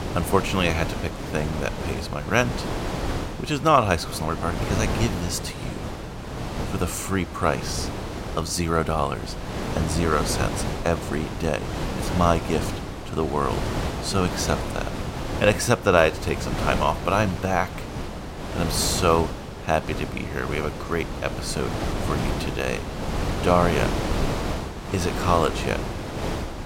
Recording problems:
wind noise on the microphone; heavy; 7 dB below the speech

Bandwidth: 16 kHz